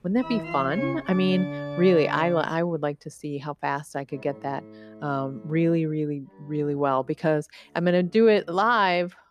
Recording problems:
background music; noticeable; throughout; 10 dB below the speech

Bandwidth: 15 kHz